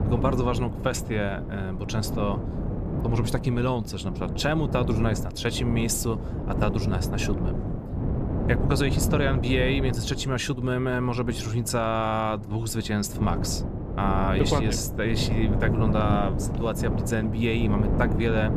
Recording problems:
wind noise on the microphone; heavy; 7 dB below the speech

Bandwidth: 14.5 kHz